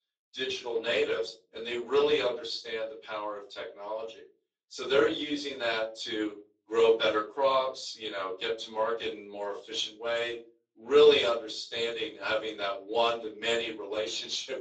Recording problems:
off-mic speech; far
thin; somewhat; fading below 400 Hz
room echo; slight; dies away in 0.3 s
garbled, watery; slightly; nothing above 7.5 kHz

